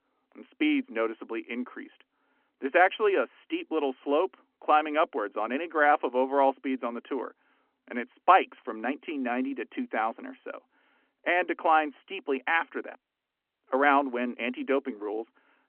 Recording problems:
phone-call audio; nothing above 3 kHz

